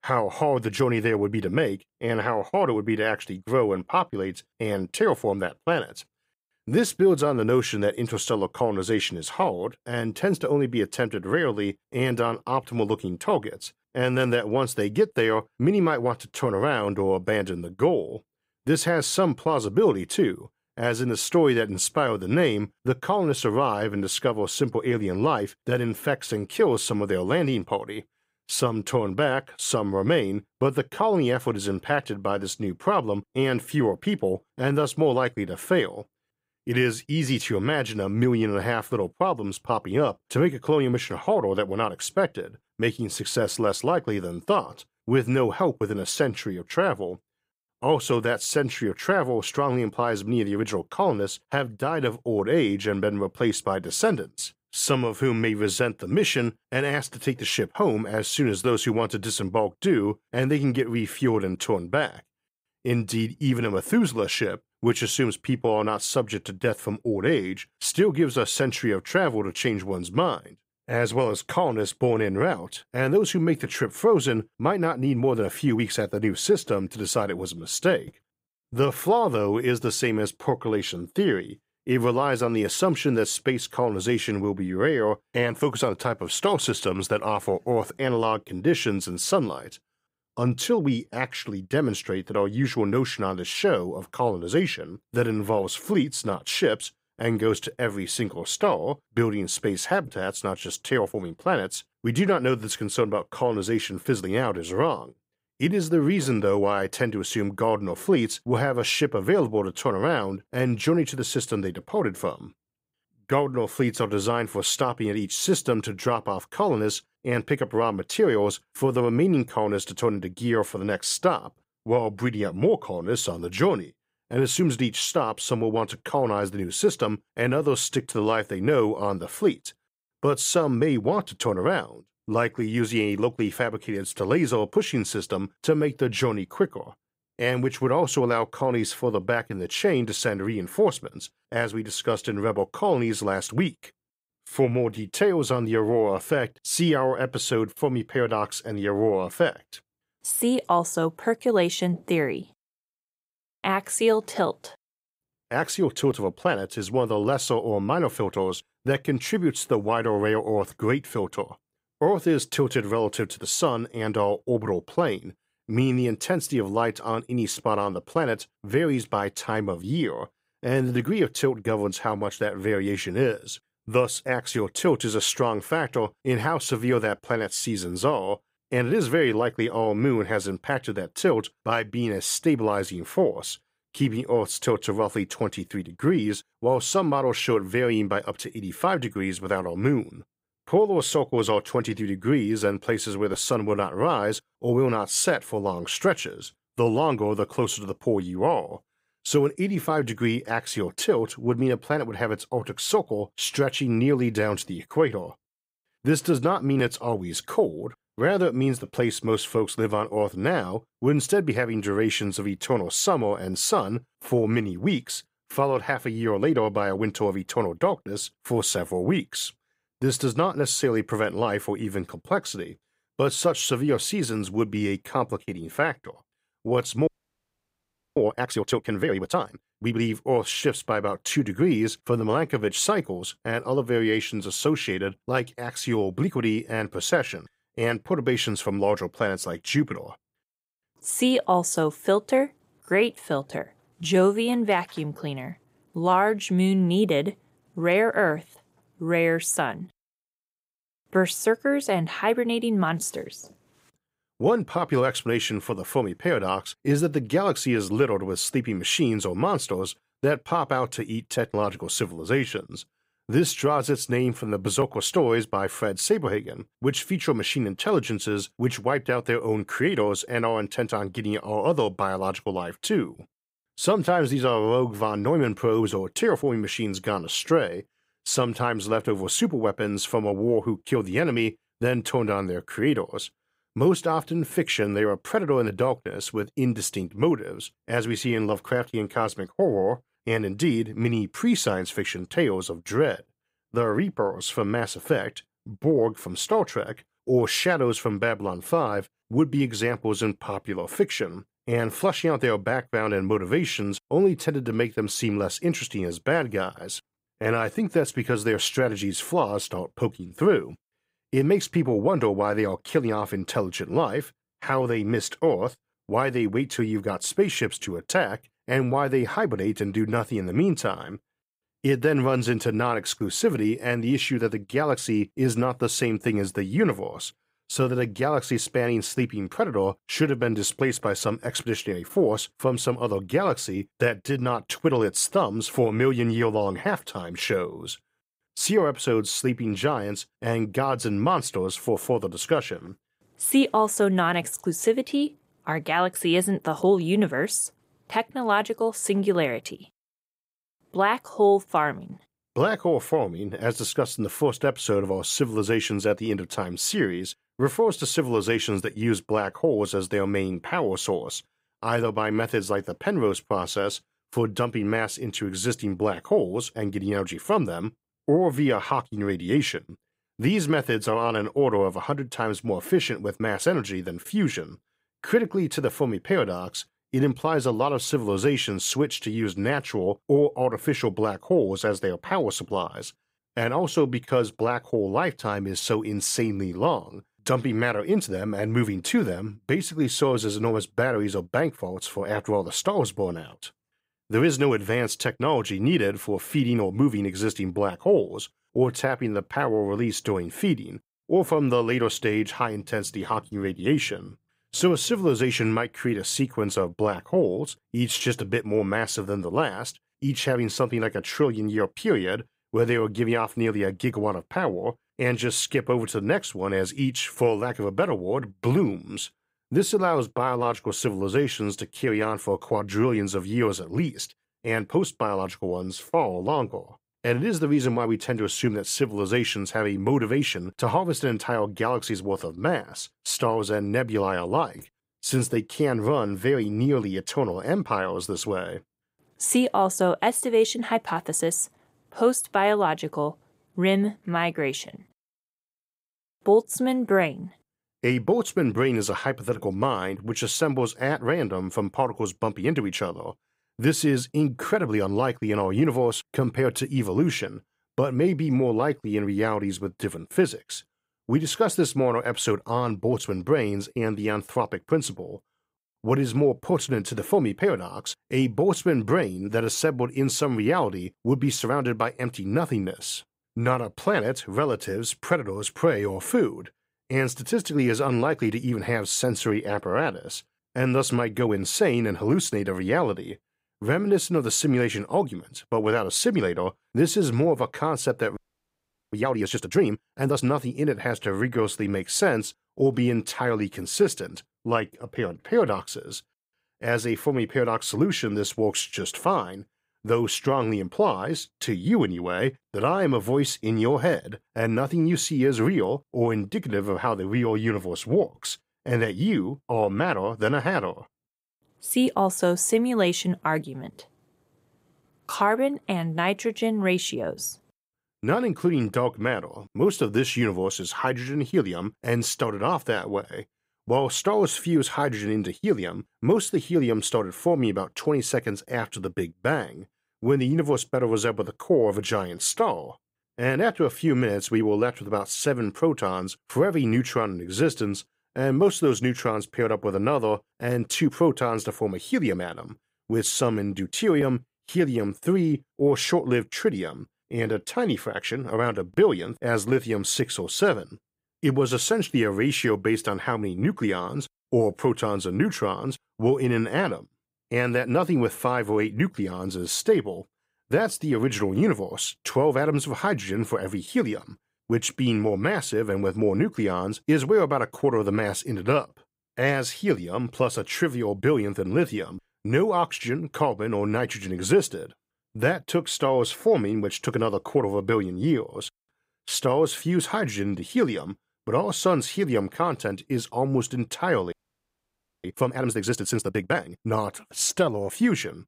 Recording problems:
audio freezing; at 3:47 for 1 s, at 8:08 for 1 s and at 9:44 for 1 s

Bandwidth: 15.5 kHz